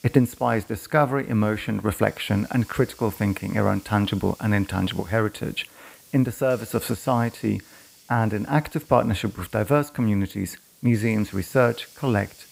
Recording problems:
hiss; faint; throughout; 25 dB below the speech

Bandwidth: 15.5 kHz